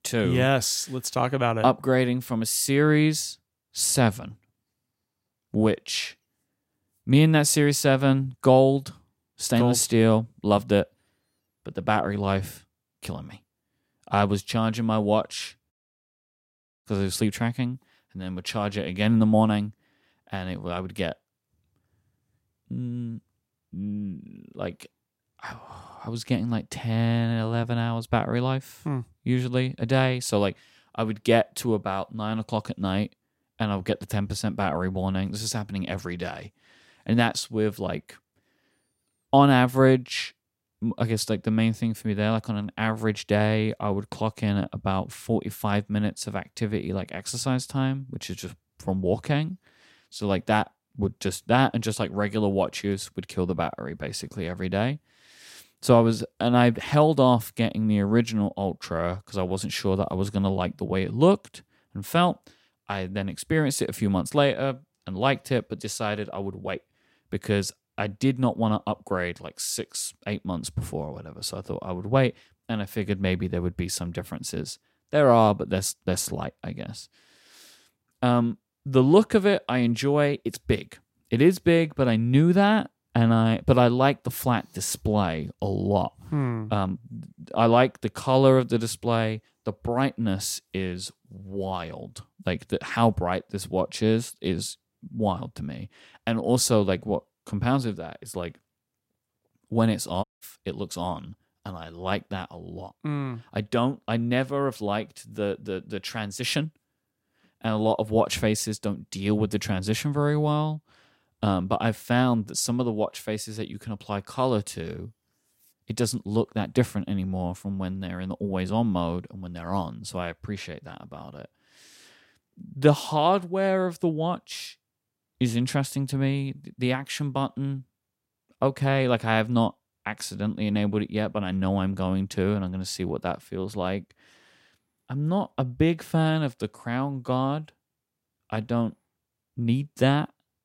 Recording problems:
audio cutting out; at 16 s for 1 s and at 1:40

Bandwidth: 16 kHz